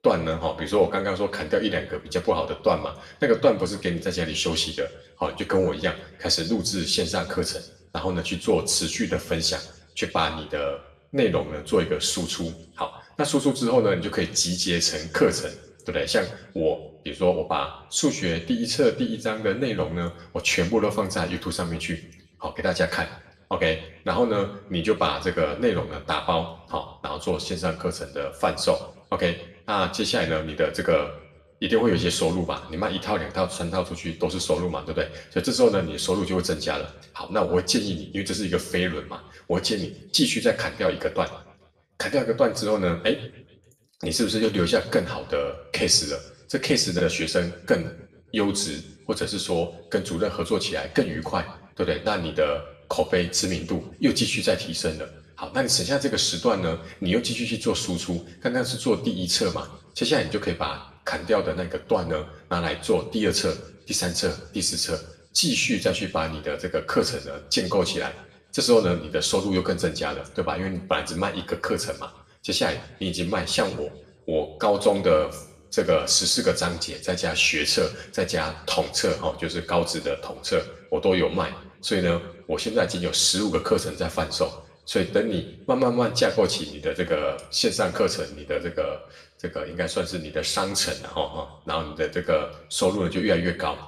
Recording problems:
off-mic speech; far
room echo; slight; dies away in 0.6 s

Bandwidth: 15 kHz